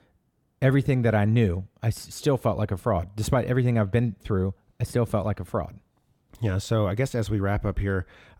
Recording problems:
none

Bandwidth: 18.5 kHz